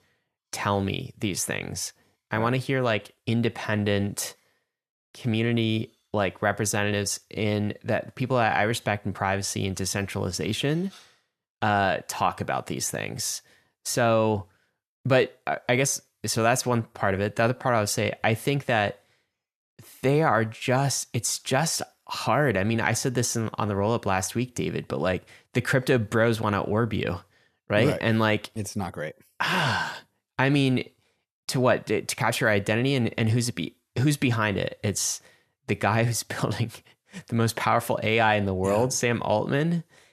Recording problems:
none

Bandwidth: 13.5 kHz